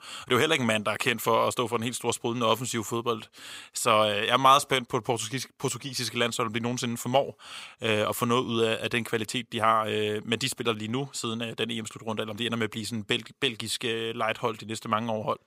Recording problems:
thin; somewhat; fading below 650 Hz

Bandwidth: 15.5 kHz